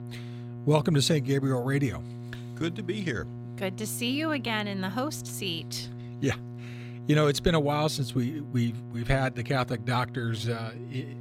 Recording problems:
electrical hum; noticeable; throughout; 60 Hz, 20 dB below the speech

